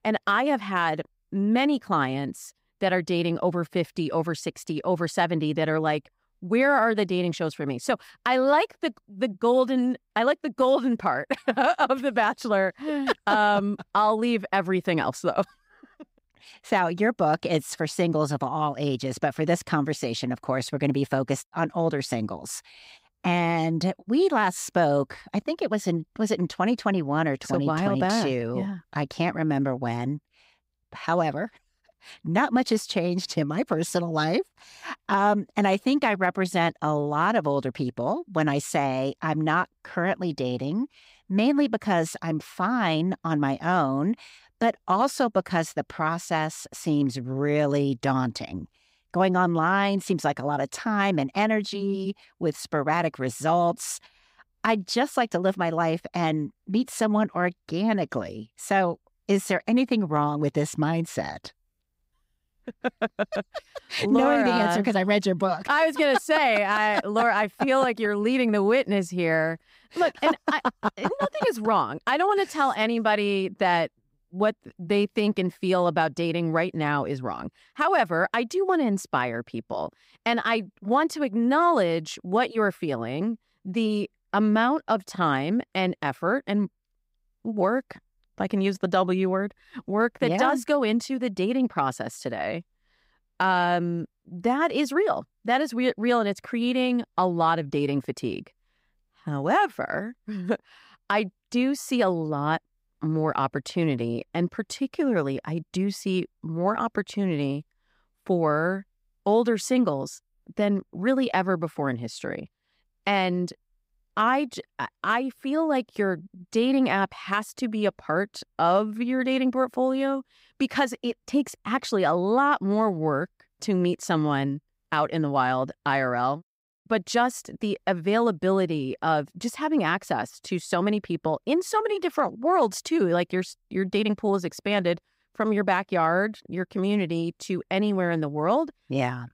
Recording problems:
none

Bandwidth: 15.5 kHz